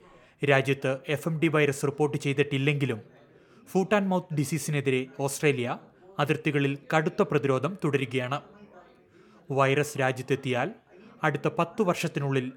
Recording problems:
background chatter; faint; throughout; 3 voices, 30 dB below the speech

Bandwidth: 17.5 kHz